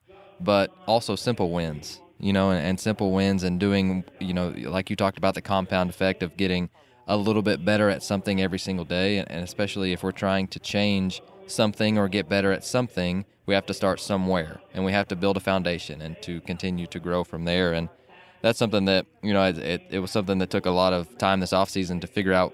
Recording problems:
background chatter; faint; throughout; 2 voices, 25 dB below the speech

